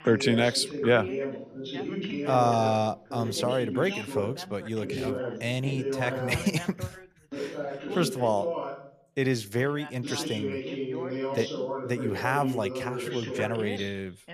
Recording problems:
background chatter; loud; throughout; 2 voices, 5 dB below the speech

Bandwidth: 14.5 kHz